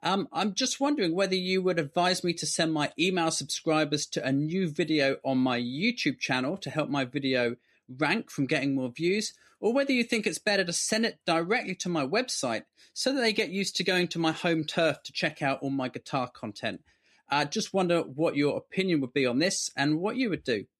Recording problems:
none

